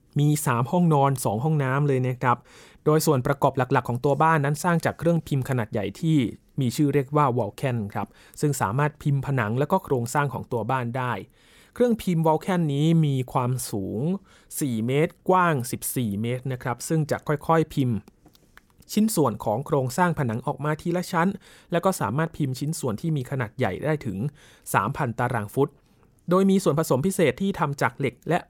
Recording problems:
none

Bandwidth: 17 kHz